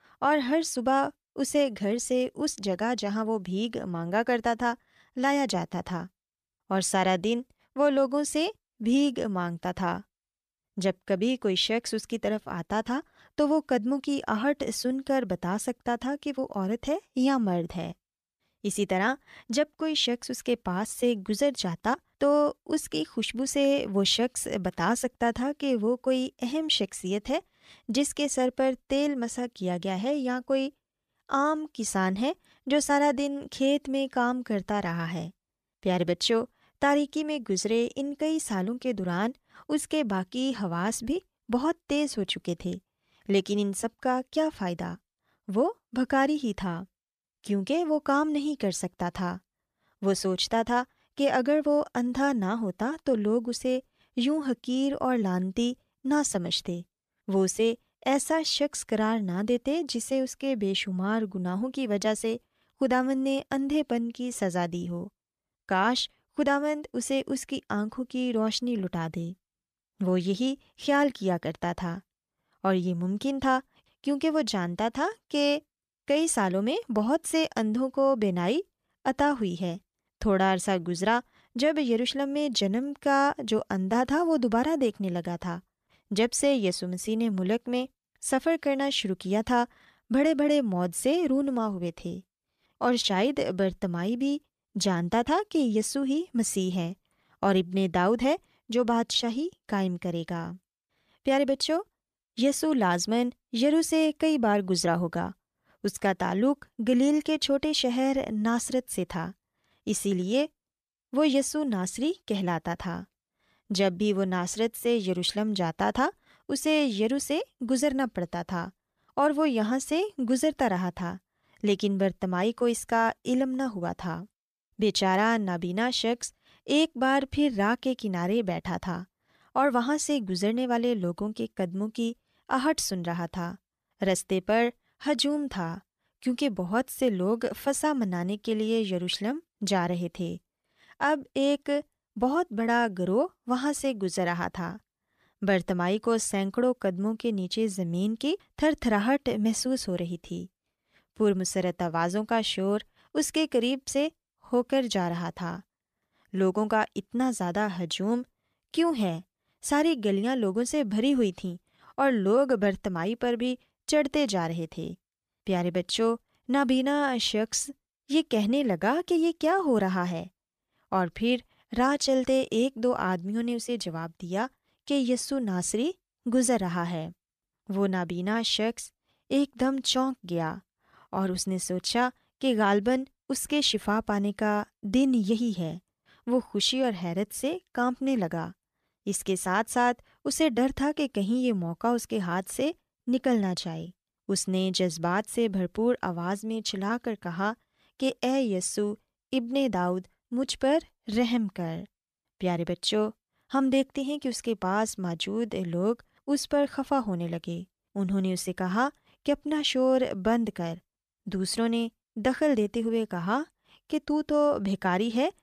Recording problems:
none

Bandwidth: 14.5 kHz